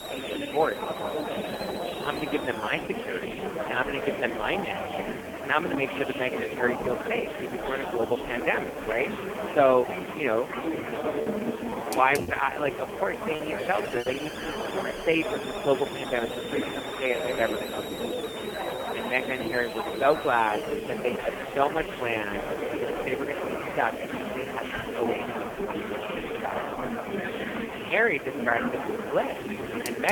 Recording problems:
phone-call audio; poor line
murmuring crowd; loud; throughout; 4 dB below the speech
hiss; noticeable; throughout; 15 dB below the speech
choppy; very; from 12 to 14 s; 10% of the speech affected
abrupt cut into speech; at the end

